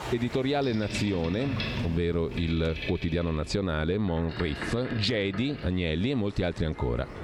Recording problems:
squashed, flat; somewhat, background pumping
train or aircraft noise; loud; throughout; 9 dB below the speech

